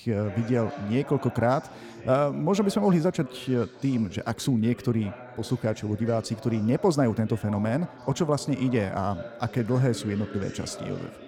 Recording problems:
background chatter; noticeable; throughout; 2 voices, 15 dB below the speech

